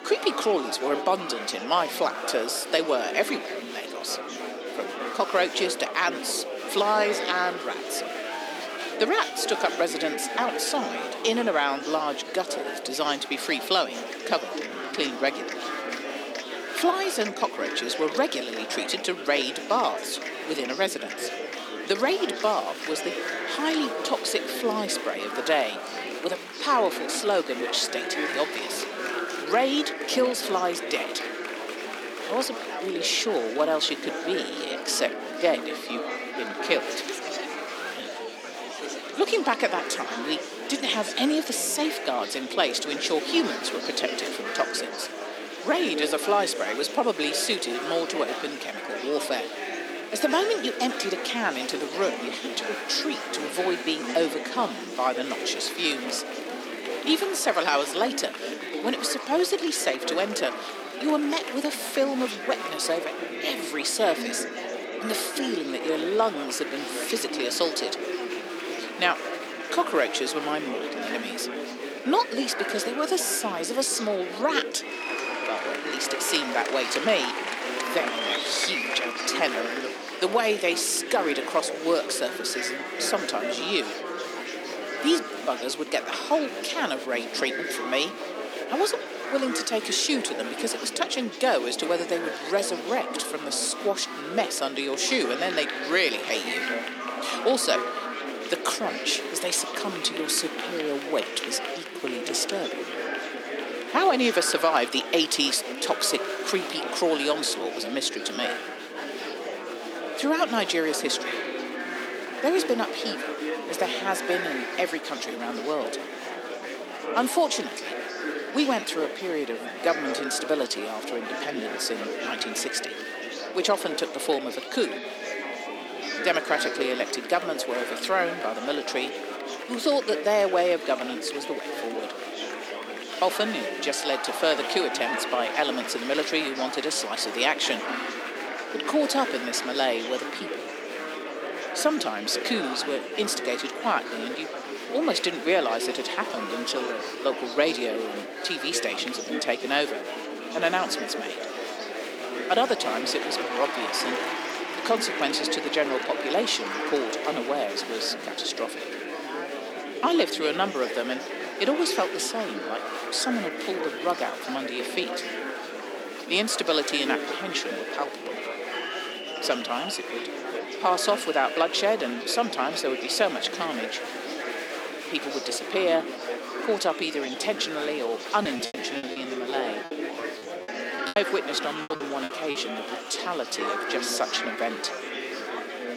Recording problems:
thin; somewhat; fading below 250 Hz
murmuring crowd; loud; throughout; 5 dB below the speech
choppy; very; from 2:58 to 3:03; 17% of the speech affected

